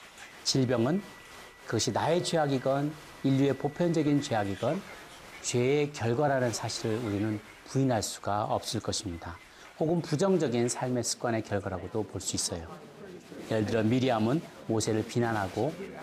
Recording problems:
crowd noise; noticeable; throughout; 15 dB below the speech

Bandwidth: 15 kHz